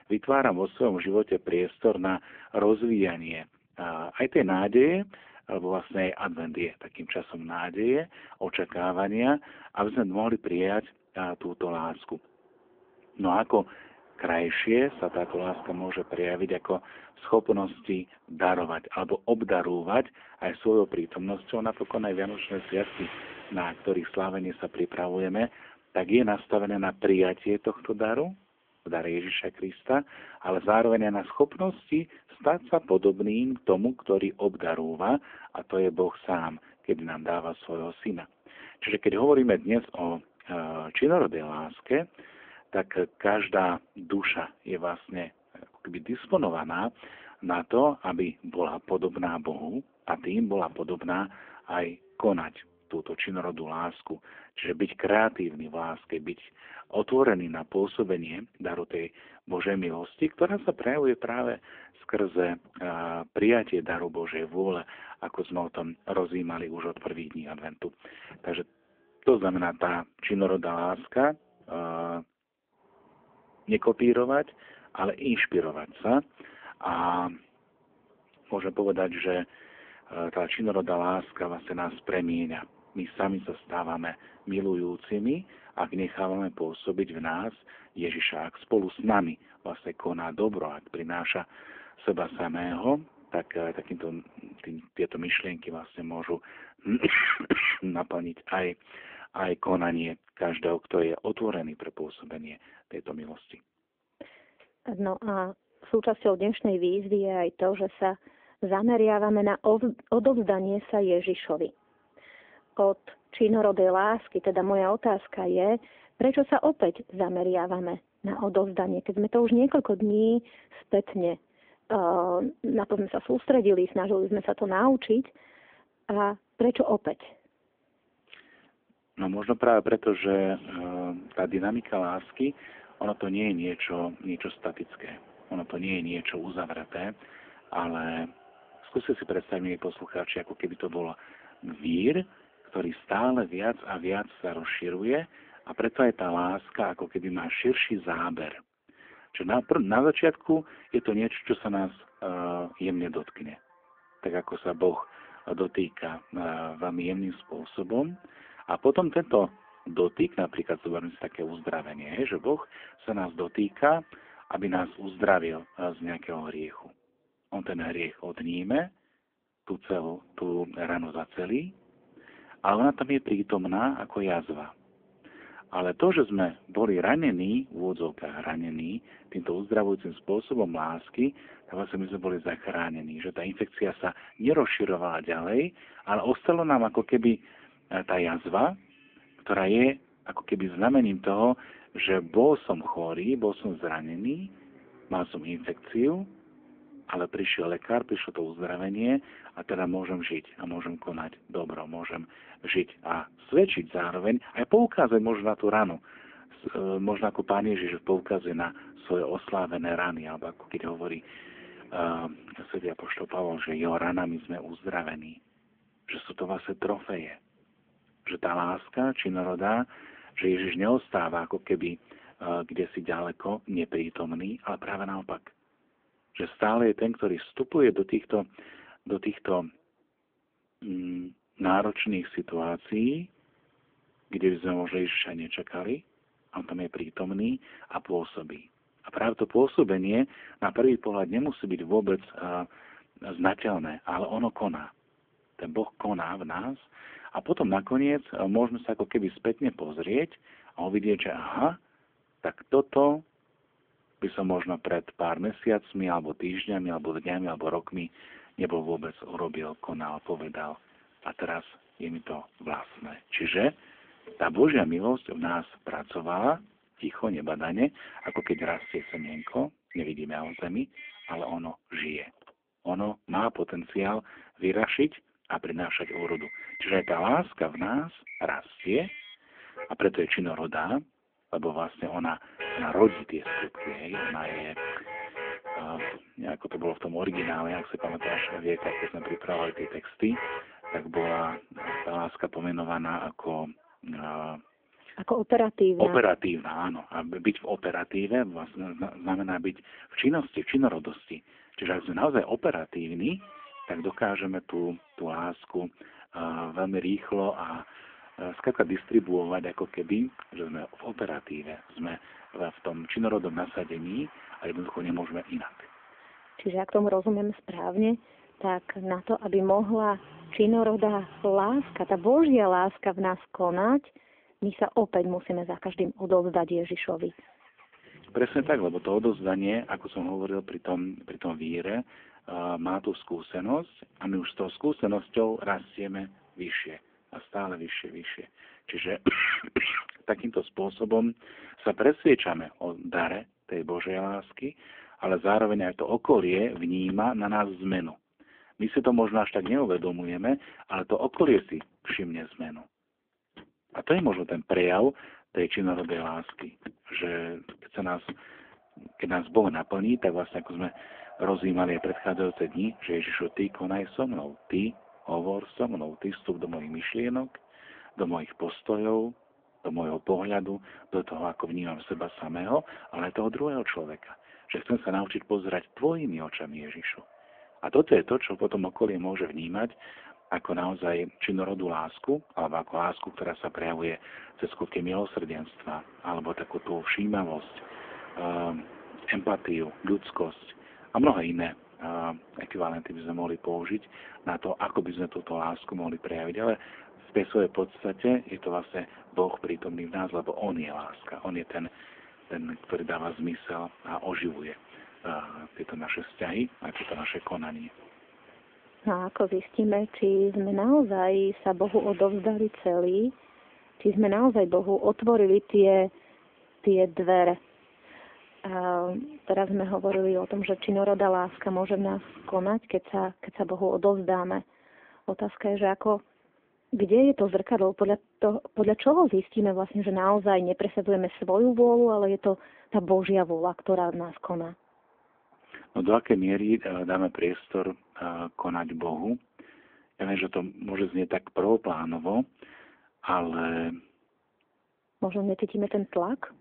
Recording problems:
phone-call audio; poor line
traffic noise; noticeable; throughout; 20 dB below the speech

